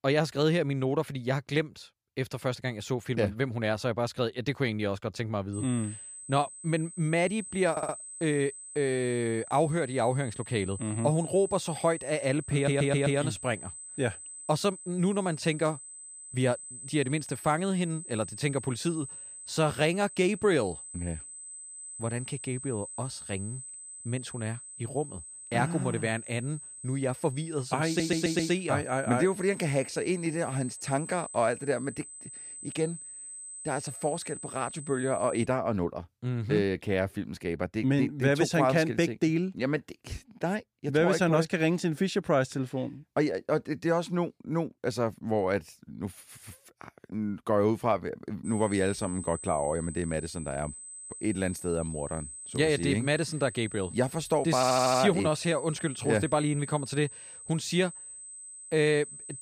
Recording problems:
high-pitched whine; noticeable; from 5.5 to 35 s and from 48 s on; 8 kHz, 10 dB below the speech
audio stuttering; 4 times, first at 7.5 s

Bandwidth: 15 kHz